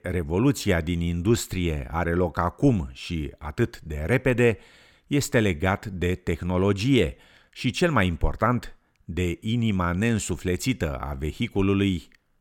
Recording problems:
none

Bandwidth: 17 kHz